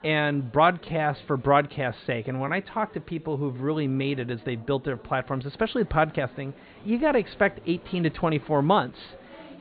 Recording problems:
high frequencies cut off; severe; nothing above 4.5 kHz
murmuring crowd; faint; throughout; 25 dB below the speech
uneven, jittery; slightly; from 0.5 to 9 s

